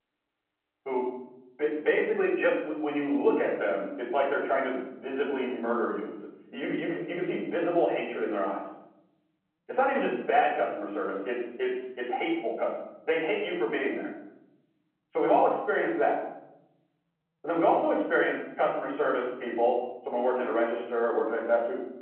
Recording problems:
off-mic speech; far
room echo; noticeable; dies away in 1.2 s
phone-call audio

